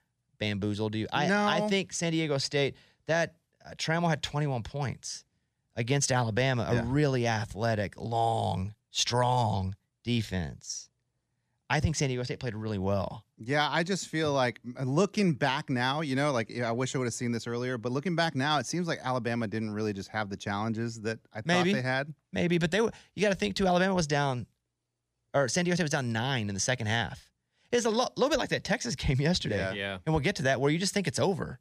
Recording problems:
none

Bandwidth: 15 kHz